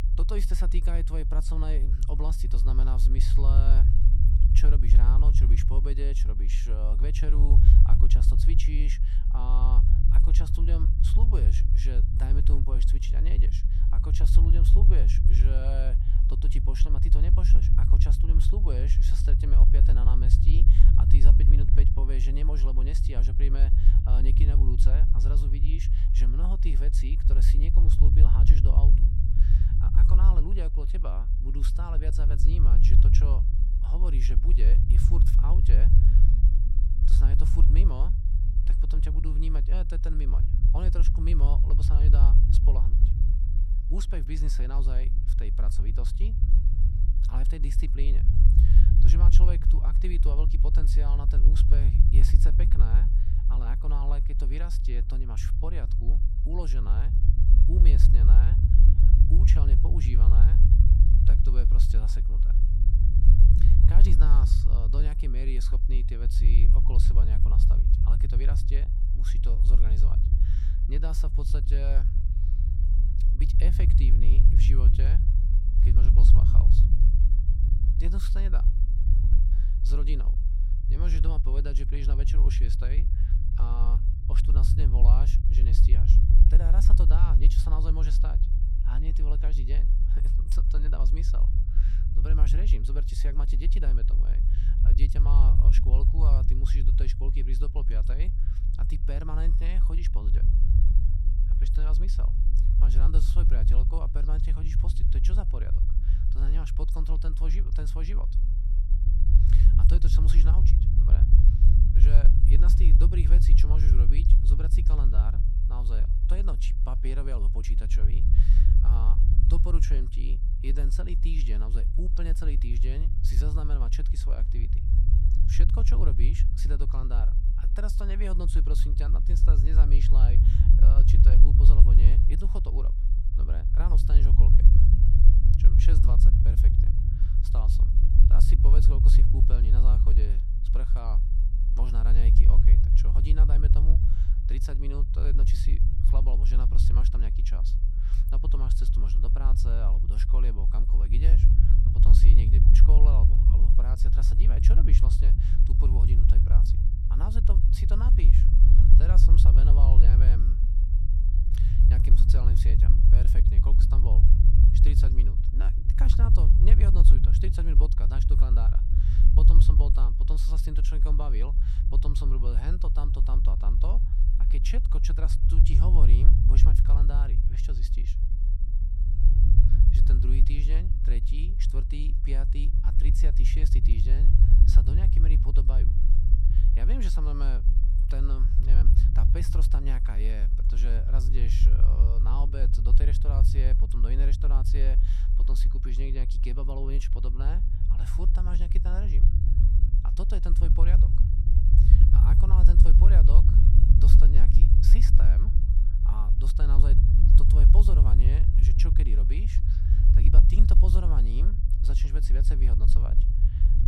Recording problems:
low rumble; loud; throughout; 1 dB below the speech

